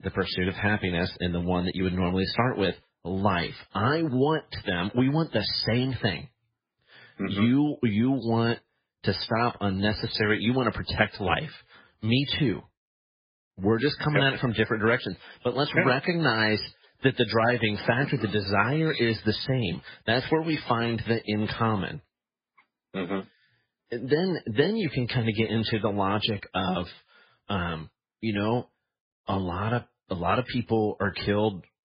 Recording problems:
garbled, watery; badly; nothing above 5 kHz

